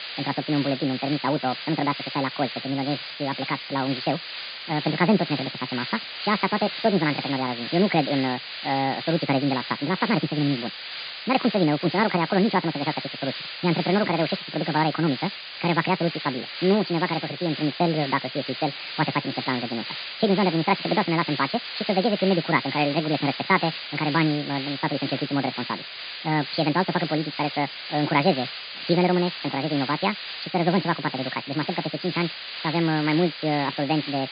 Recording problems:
high frequencies cut off; severe; nothing above 5 kHz
wrong speed and pitch; too fast and too high; 1.7 times normal speed
hiss; loud; throughout; 7 dB below the speech

